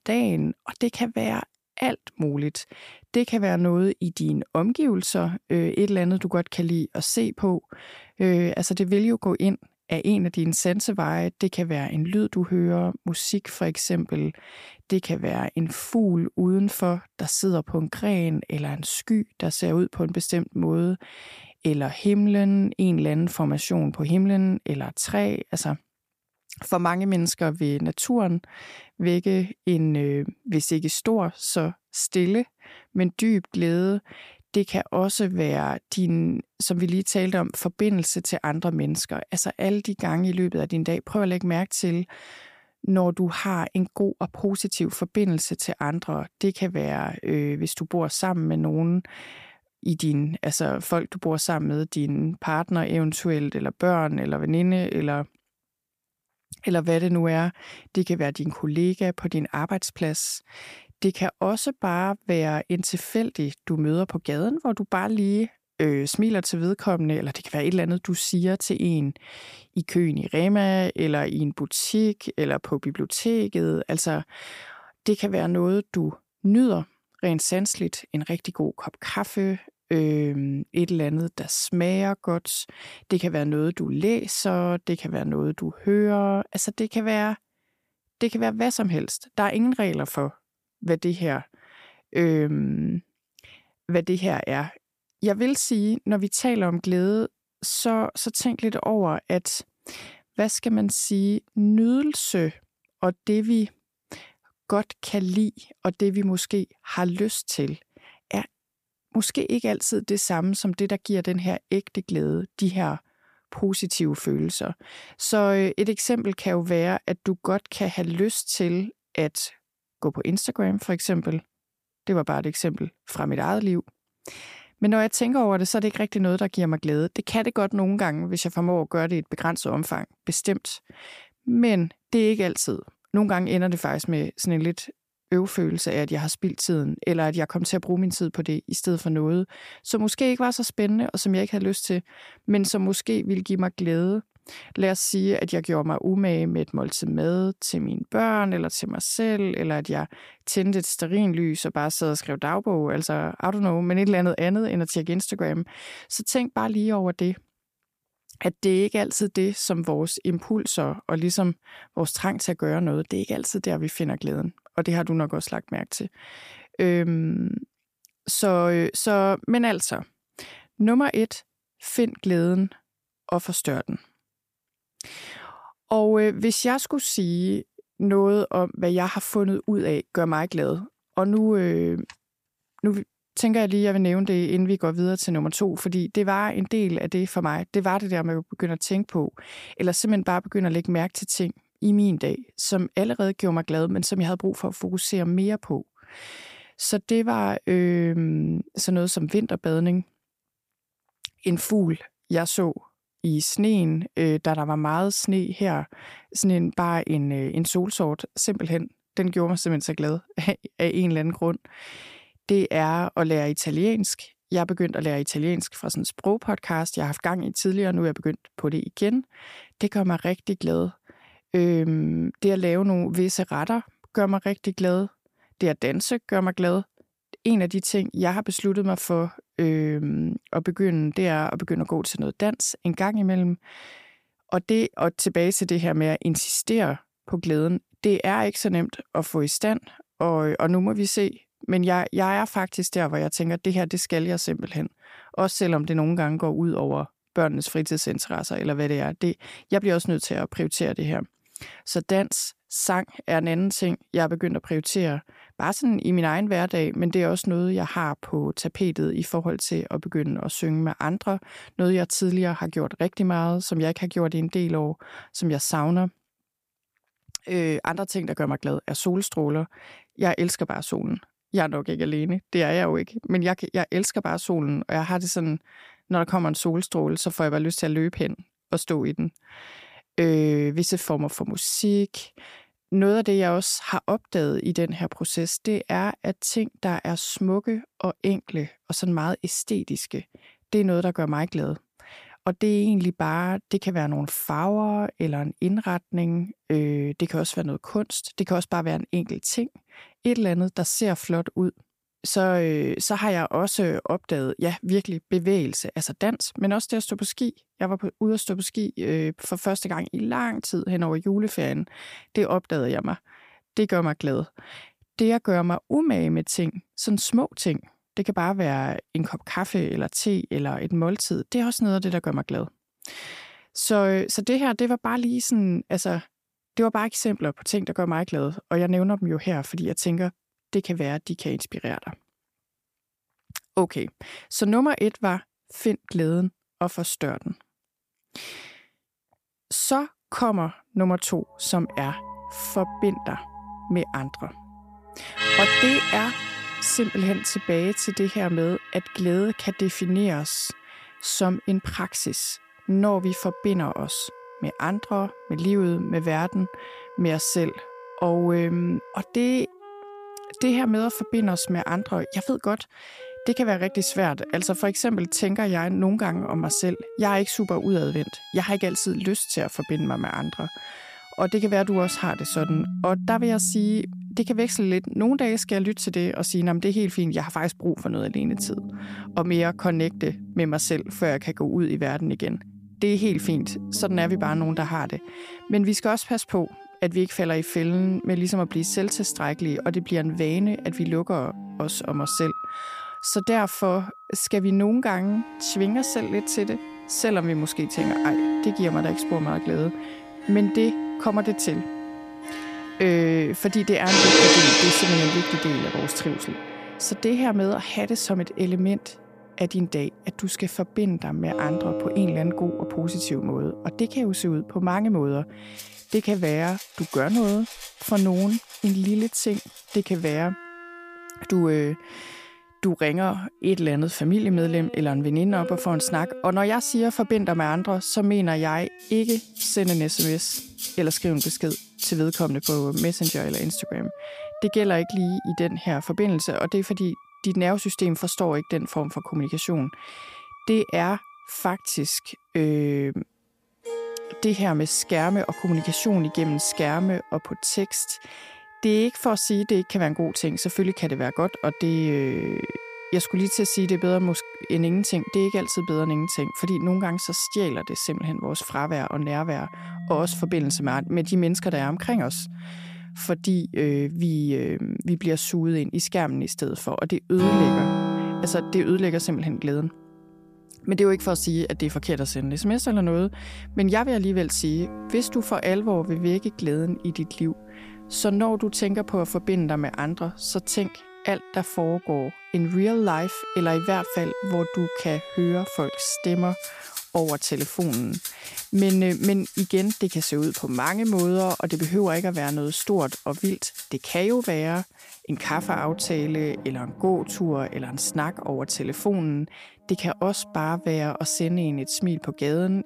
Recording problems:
background music; loud; from 5:42 on; 6 dB below the speech

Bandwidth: 15 kHz